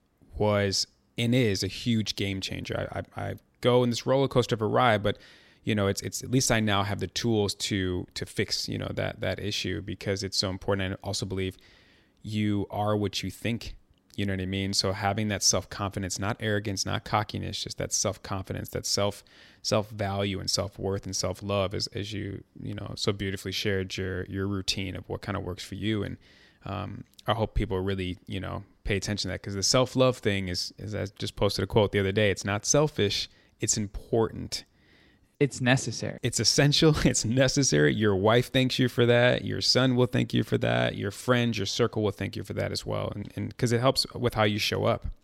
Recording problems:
none

